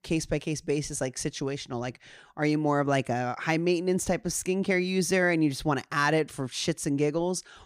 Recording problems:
none

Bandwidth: 15.5 kHz